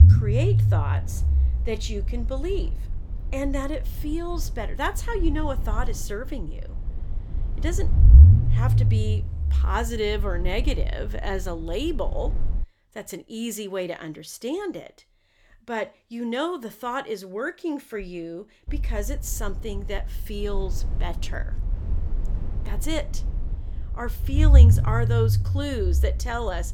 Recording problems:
low rumble; loud; until 13 s and from 19 s on; 8 dB below the speech

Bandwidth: 18 kHz